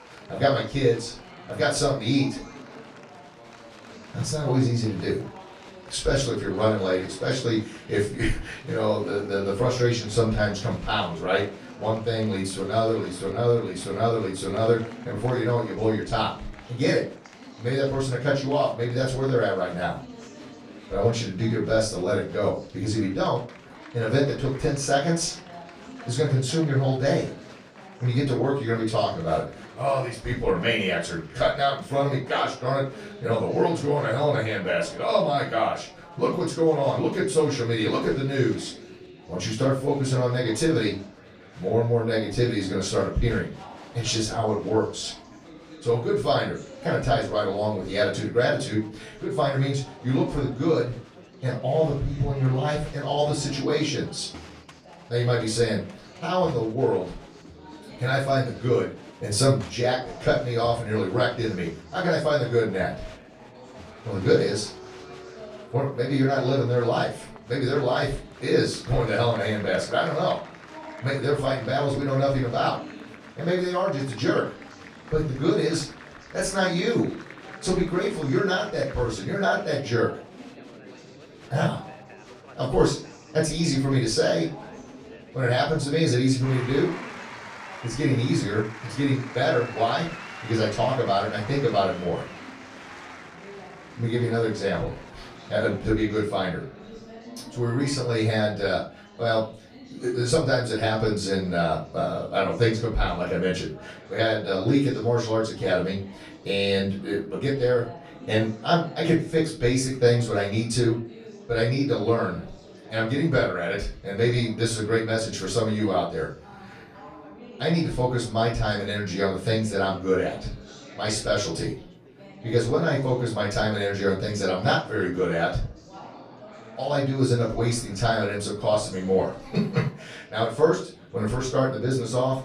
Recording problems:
off-mic speech; far
room echo; slight; dies away in 0.3 s
chatter from many people; noticeable; throughout; 20 dB below the speech

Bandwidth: 14.5 kHz